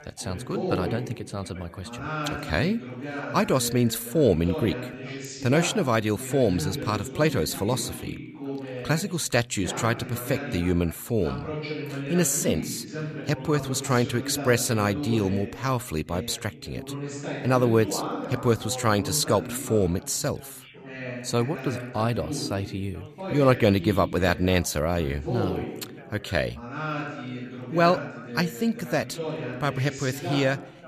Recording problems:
background chatter; loud; throughout; 2 voices, 9 dB below the speech

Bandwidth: 14.5 kHz